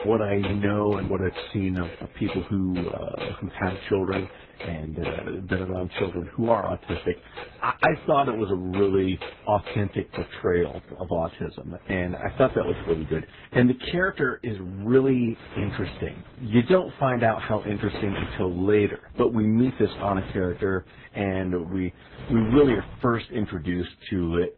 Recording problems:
garbled, watery; badly; nothing above 4 kHz
household noises; noticeable; throughout; 15 dB below the speech

